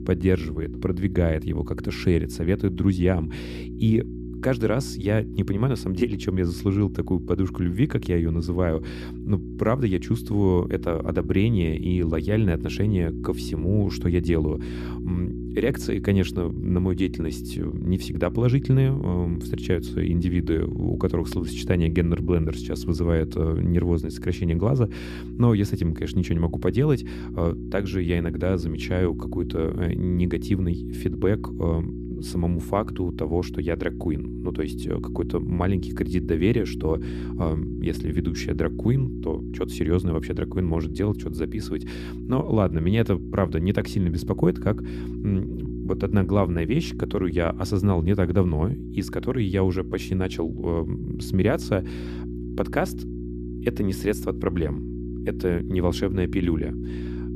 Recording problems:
electrical hum; loud; throughout; 60 Hz, 10 dB below the speech

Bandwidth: 14.5 kHz